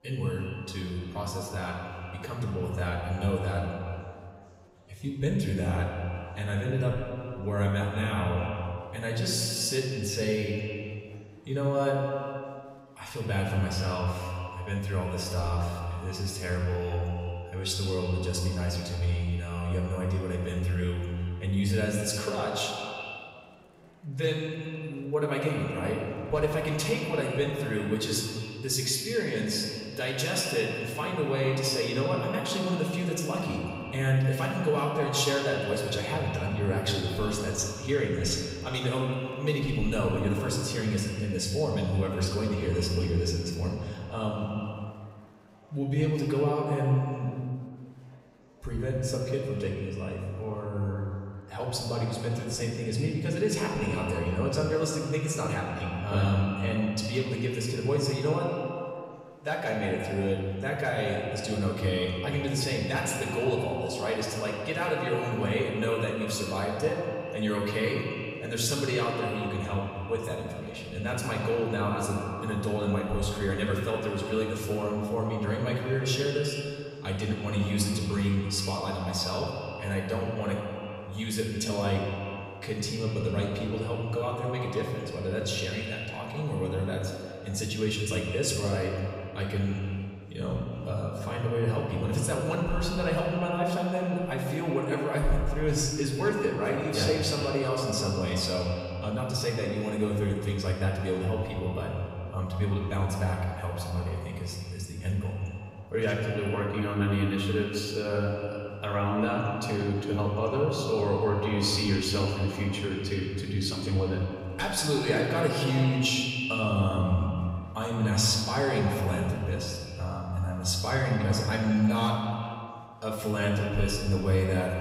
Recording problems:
echo of what is said; strong; throughout; 160 ms later, 9 dB below the speech
off-mic speech; far
room echo; noticeable; dies away in 1.1 s
murmuring crowd; faint; throughout; 30 dB below the speech

